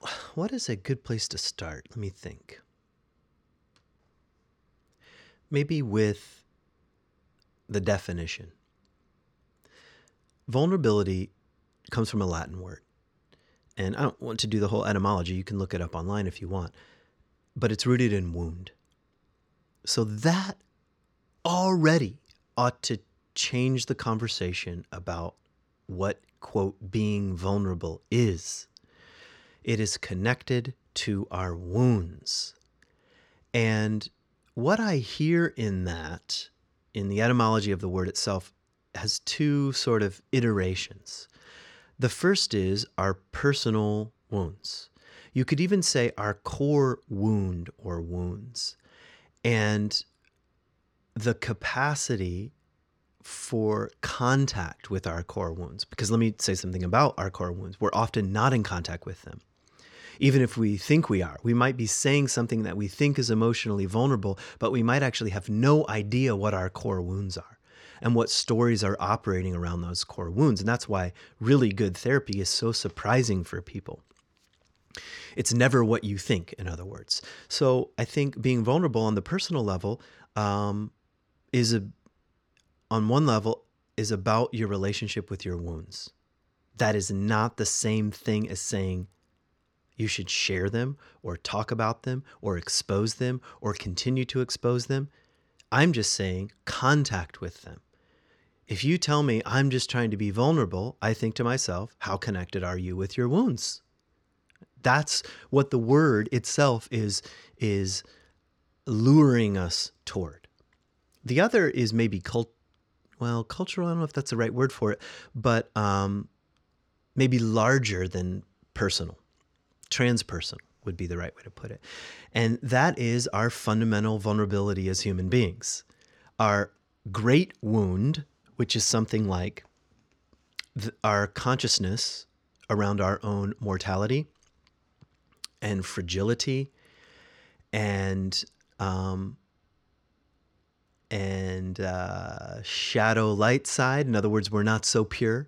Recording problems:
none

